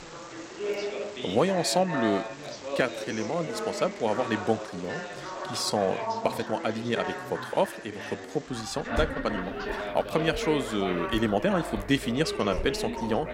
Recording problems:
background chatter; loud; throughout; 3 voices, 6 dB below the speech
animal sounds; noticeable; throughout; 15 dB below the speech
rain or running water; faint; from 9.5 s on; 20 dB below the speech
uneven, jittery; strongly; from 2.5 to 13 s

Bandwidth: 16 kHz